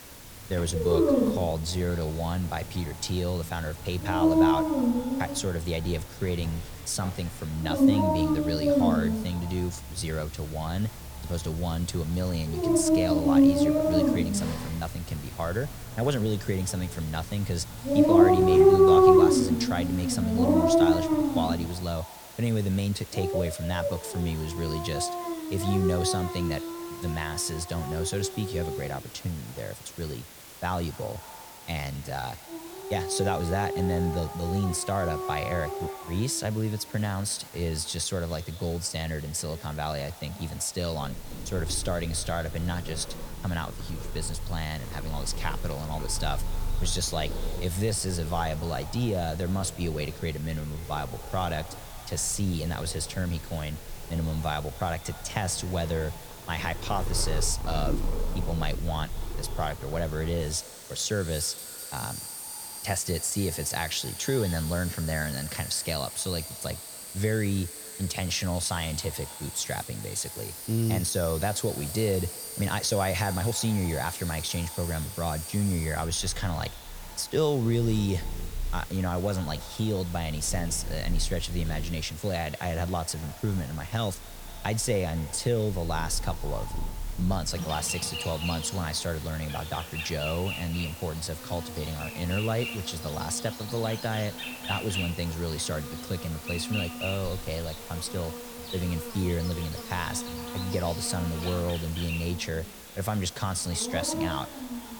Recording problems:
echo of what is said; faint; throughout; 230 ms later, 20 dB below the speech
animal sounds; very loud; throughout; 1 dB above the speech
hiss; noticeable; throughout; 15 dB below the speech
uneven, jittery; strongly; from 1.5 s to 1:32

